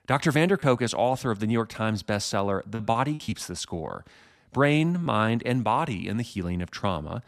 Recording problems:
choppy; occasionally; 4% of the speech affected

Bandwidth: 14 kHz